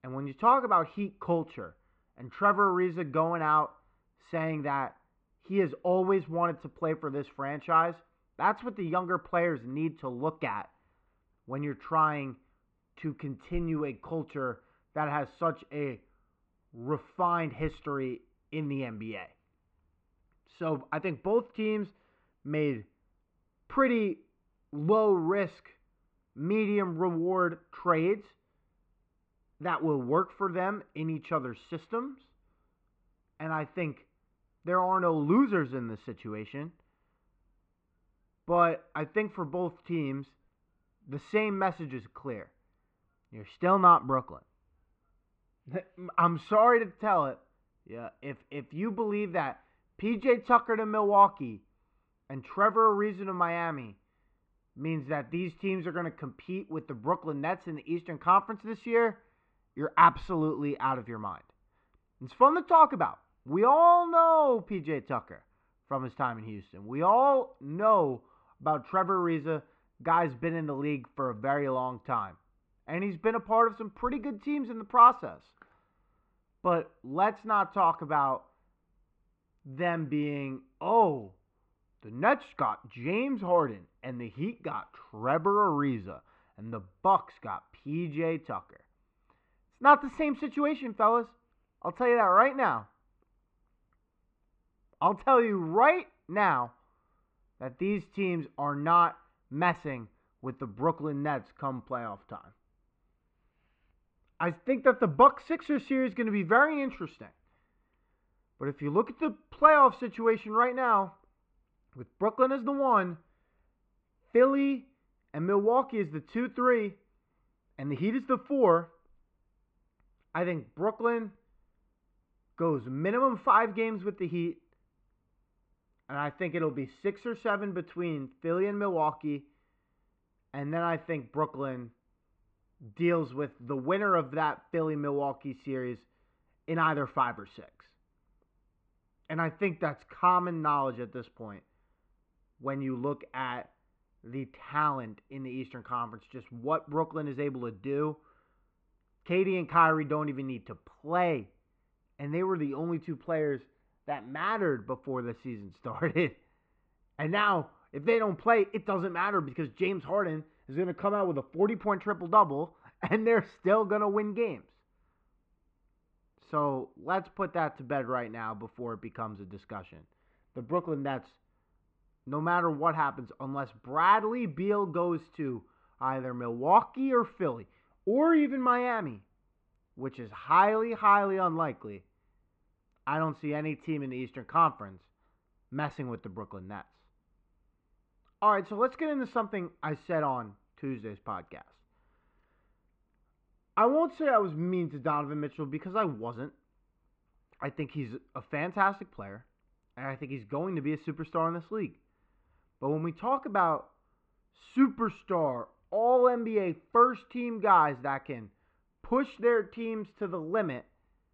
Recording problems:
muffled; very; fading above 2.5 kHz

